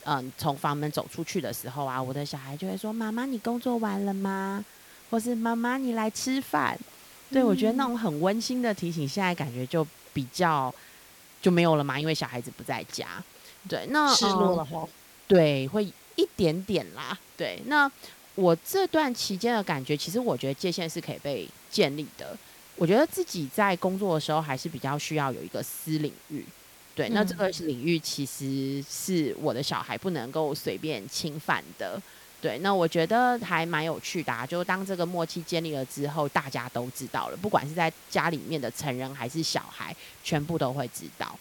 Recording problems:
hiss; faint; throughout; 20 dB below the speech

